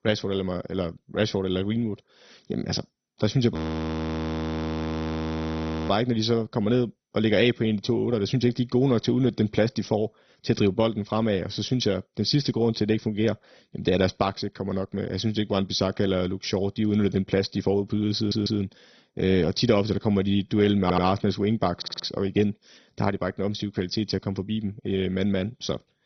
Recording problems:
garbled, watery; badly; nothing above 6 kHz
audio freezing; at 3.5 s for 2.5 s
audio stuttering; at 18 s, at 21 s and at 22 s

